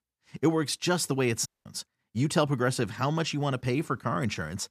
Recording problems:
audio cutting out; at 1.5 s

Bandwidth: 14.5 kHz